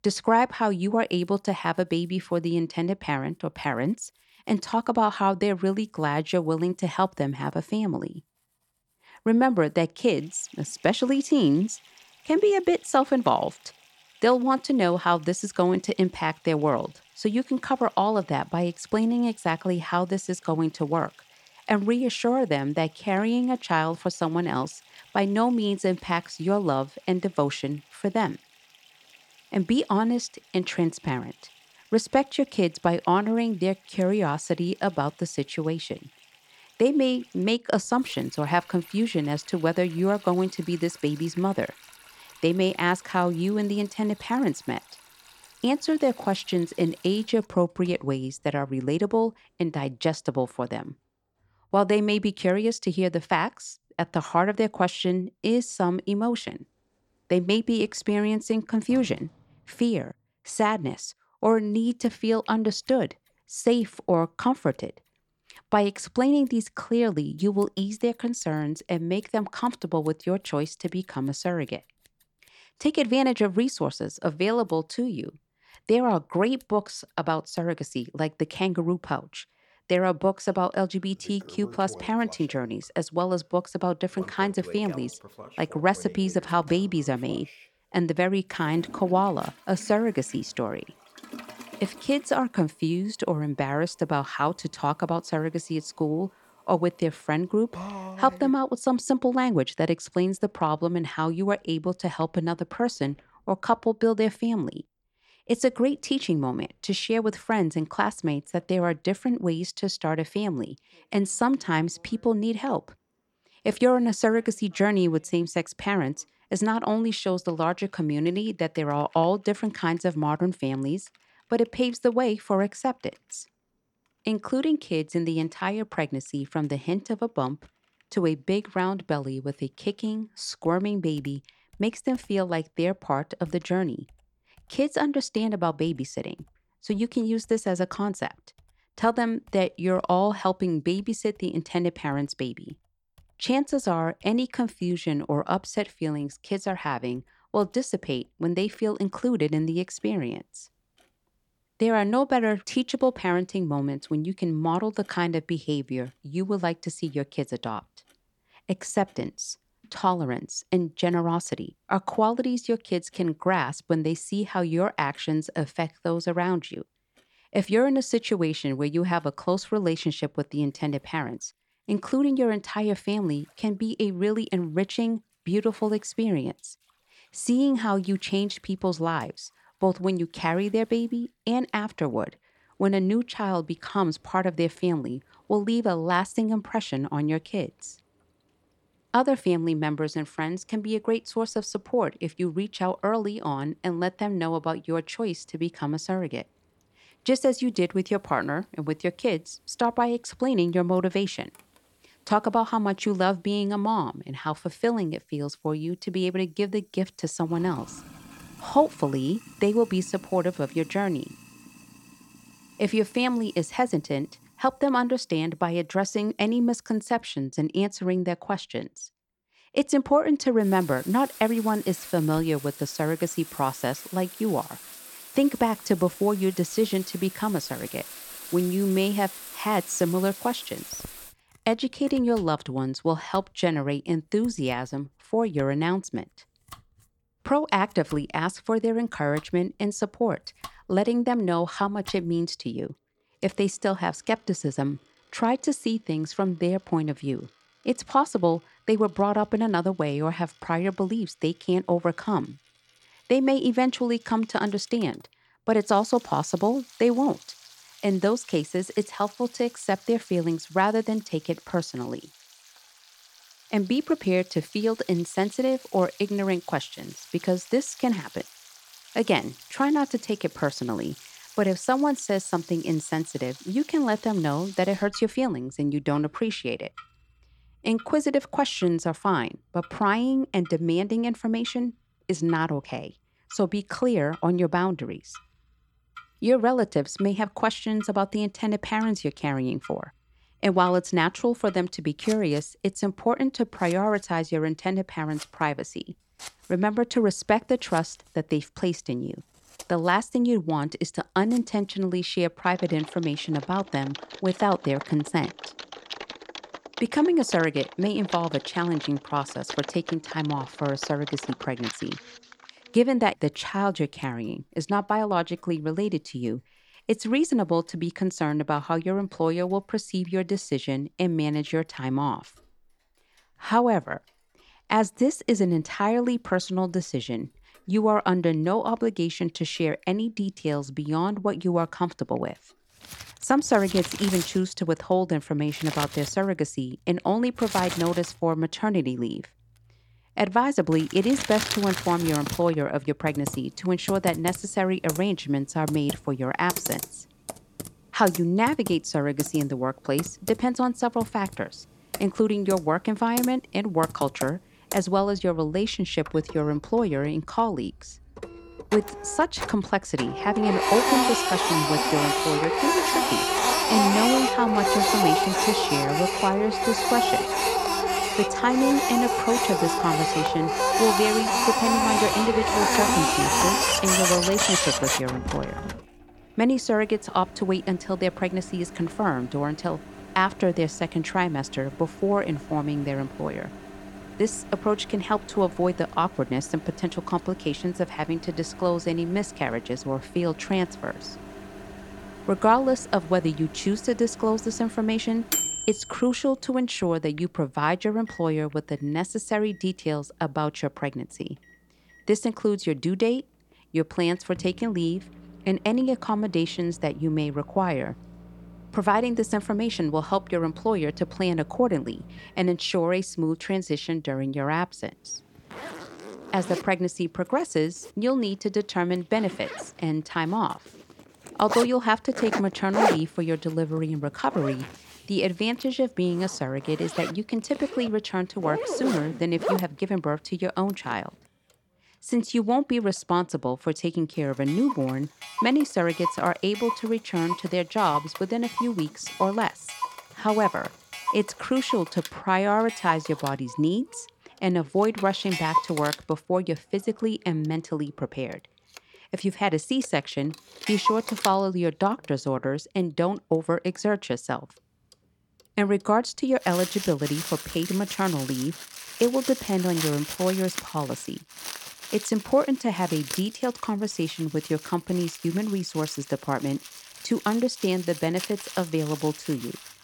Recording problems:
household noises; loud; throughout; 5 dB below the speech

